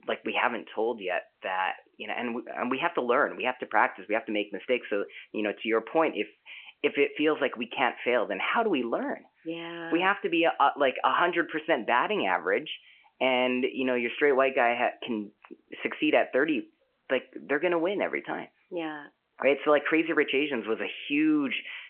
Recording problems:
phone-call audio; nothing above 3 kHz

